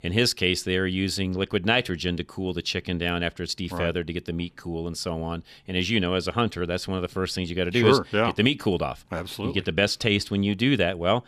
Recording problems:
none

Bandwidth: 14 kHz